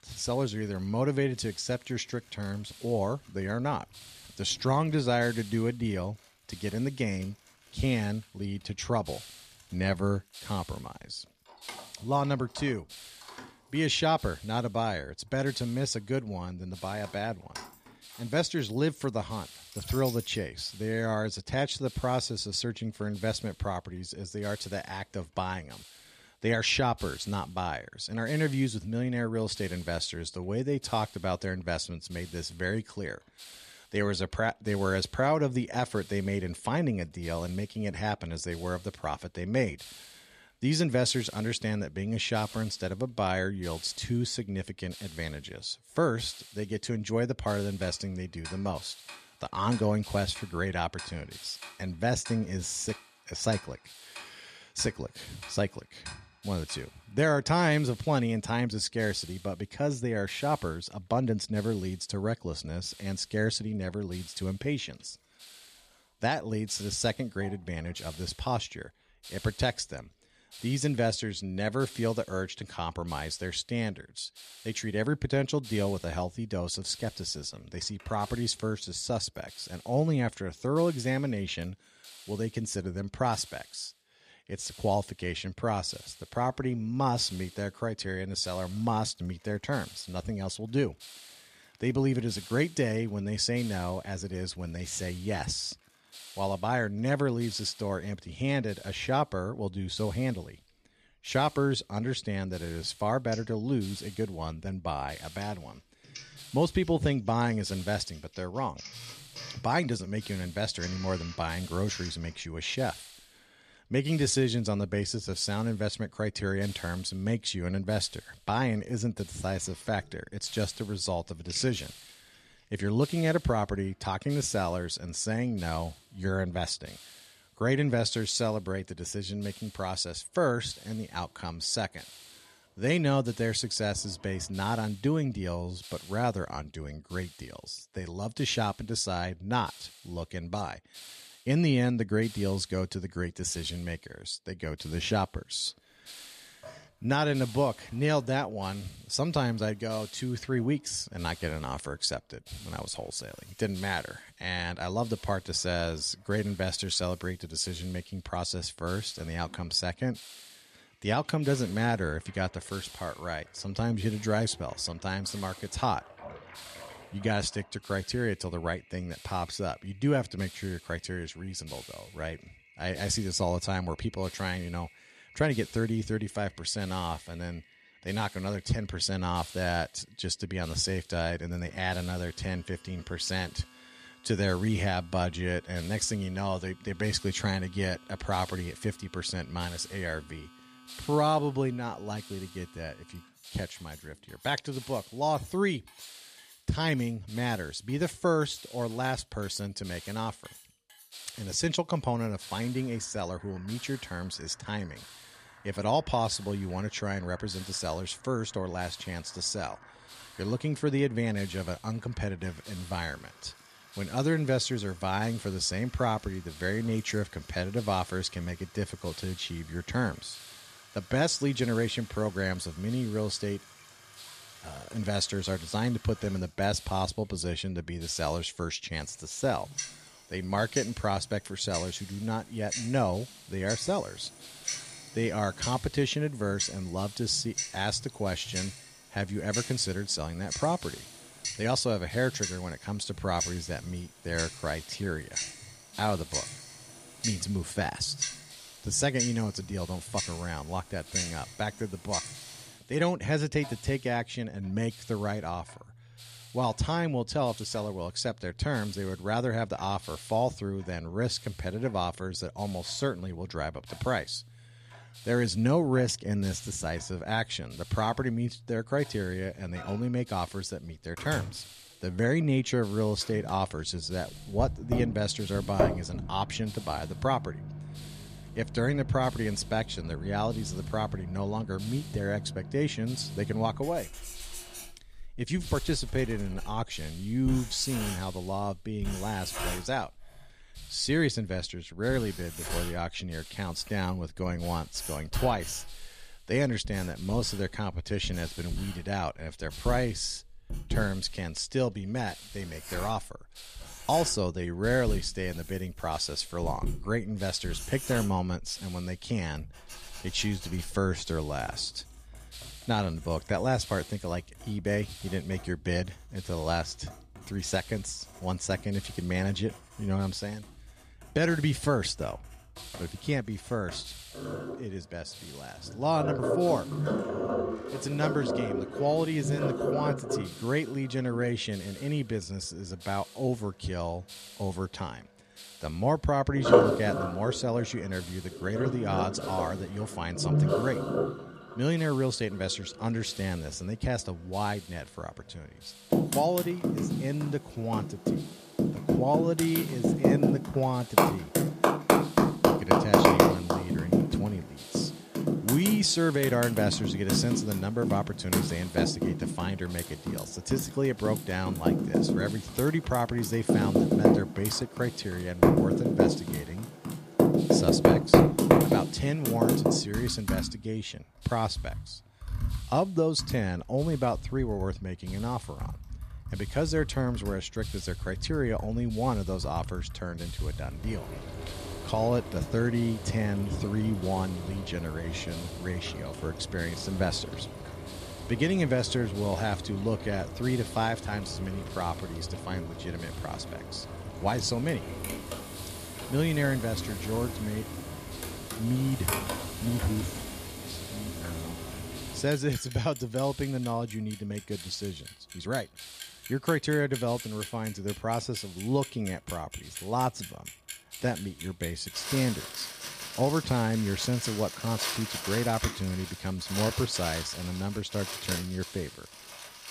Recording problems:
household noises; loud; throughout; 1 dB below the speech
hiss; noticeable; throughout; 20 dB below the speech

